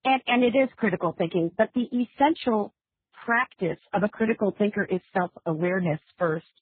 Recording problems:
garbled, watery; badly

